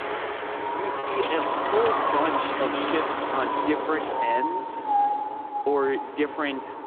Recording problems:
phone-call audio; nothing above 3.5 kHz
wind in the background; very loud; throughout; 2 dB above the speech
background music; very faint; until 2.5 s; 25 dB below the speech
choppy; occasionally; 1% of the speech affected

